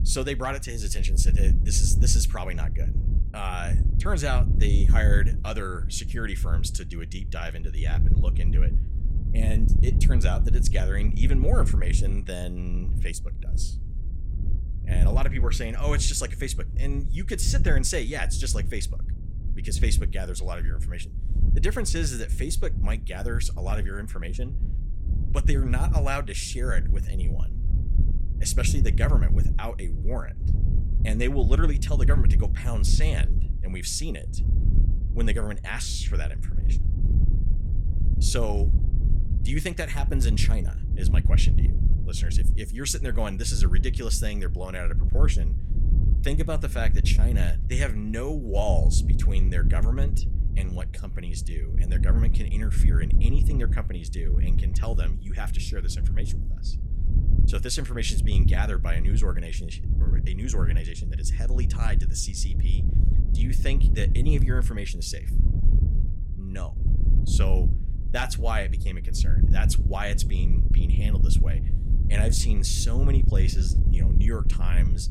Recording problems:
wind noise on the microphone; heavy; 9 dB below the speech

